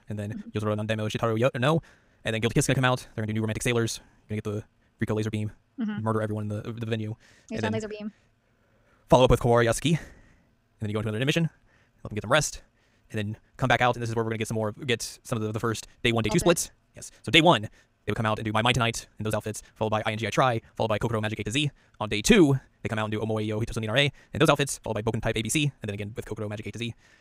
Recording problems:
wrong speed, natural pitch; too fast; 1.8 times normal speed

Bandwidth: 15.5 kHz